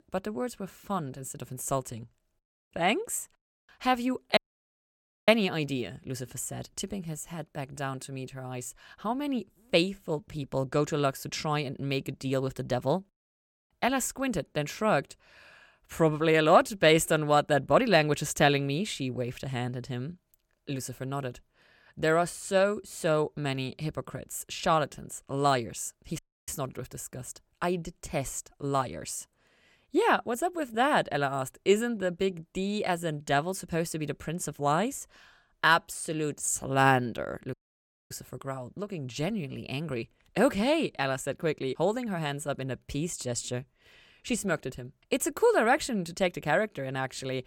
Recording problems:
audio cutting out; at 4.5 s for 1 s, at 26 s and at 38 s for 0.5 s

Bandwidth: 17 kHz